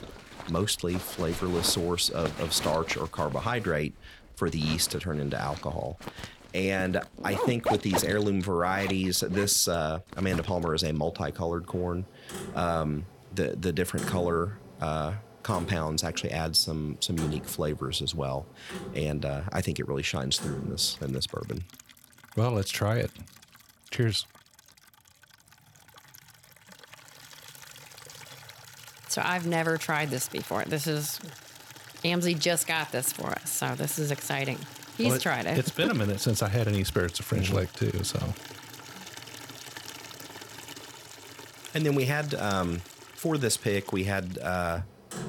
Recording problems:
household noises; noticeable; throughout; 15 dB below the speech

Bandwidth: 17 kHz